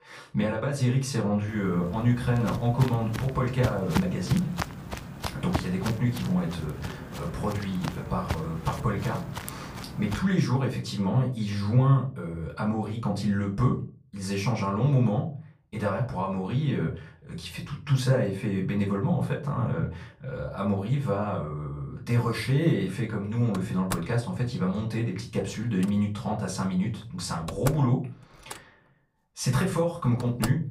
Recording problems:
off-mic speech; far
room echo; slight; dies away in 0.3 s
footsteps; noticeable; from 2 to 10 s; peak 3 dB below the speech
door banging; noticeable; from 24 s on; peak 8 dB below the speech

